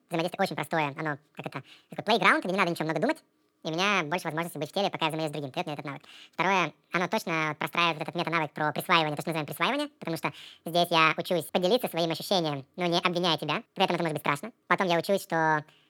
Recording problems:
wrong speed and pitch; too fast and too high; 1.7 times normal speed

